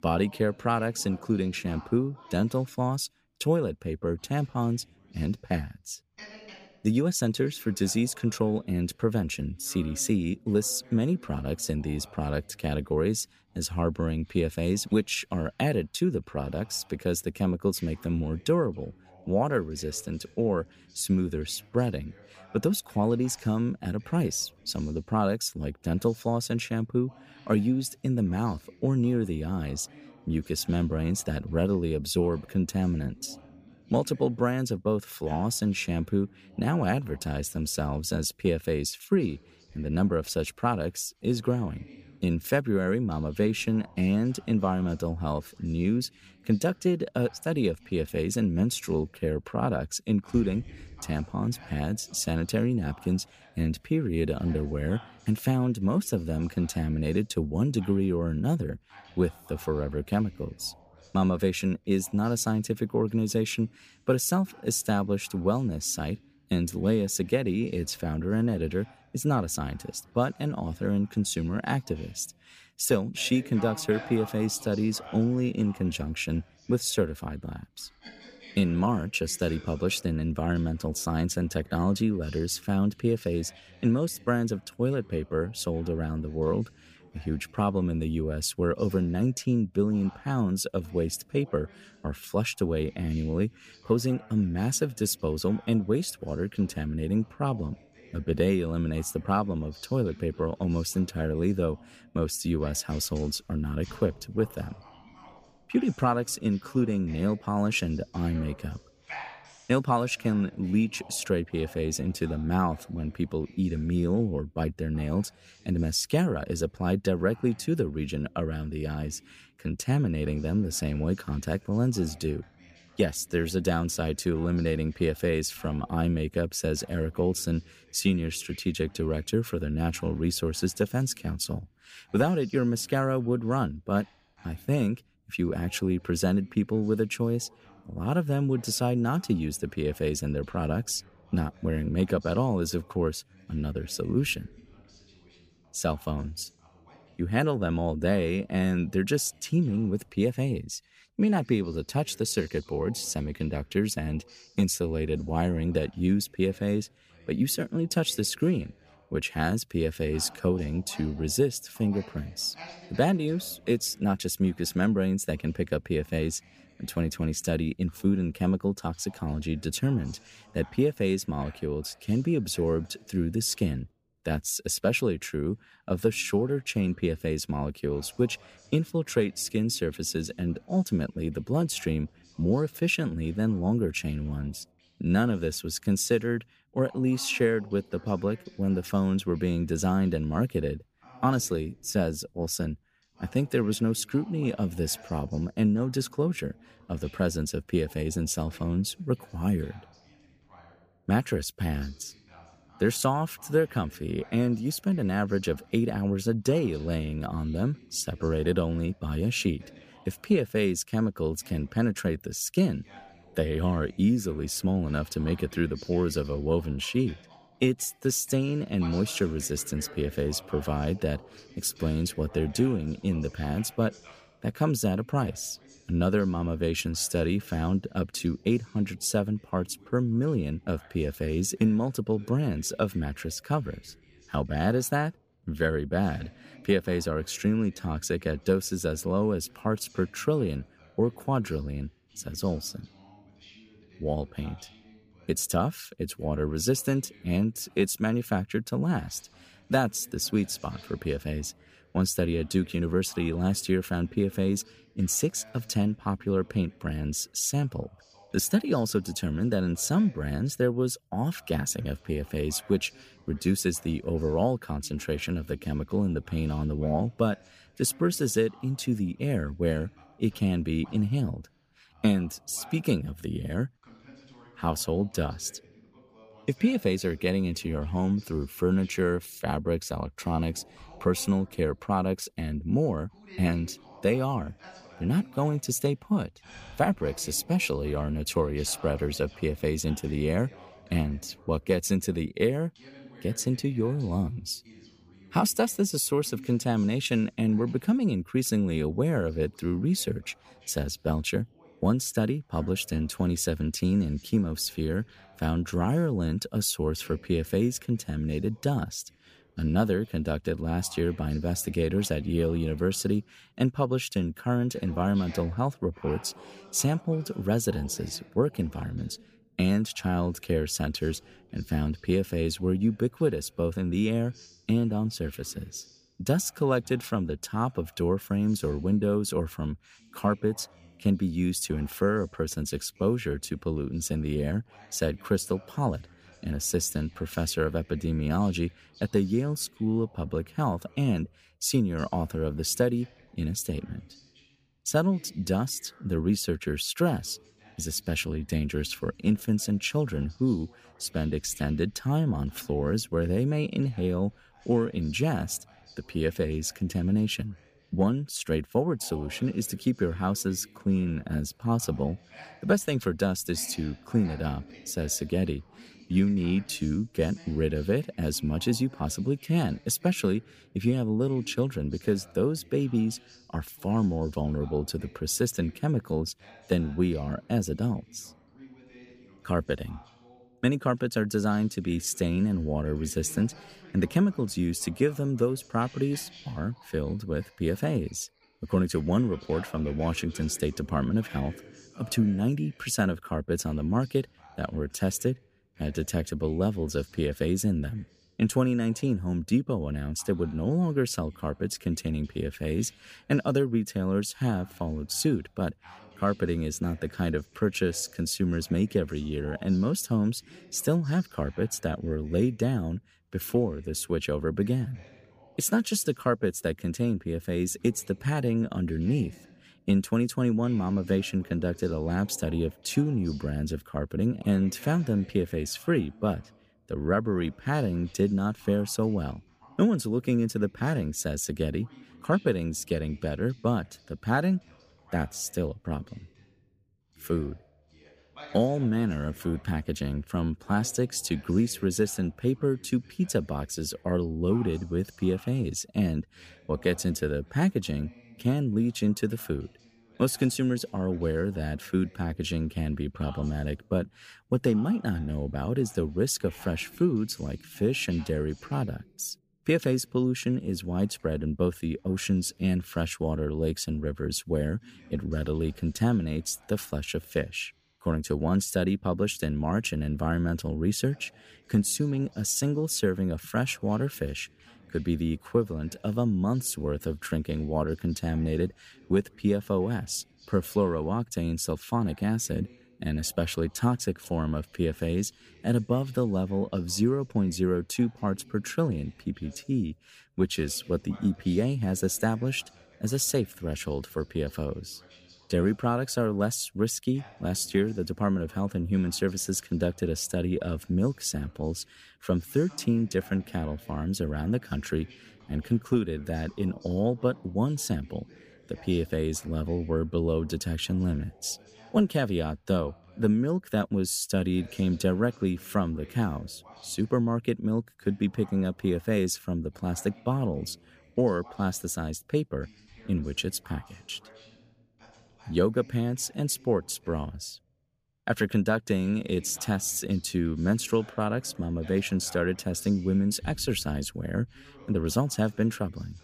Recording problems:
voice in the background; faint; throughout; 25 dB below the speech

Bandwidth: 15 kHz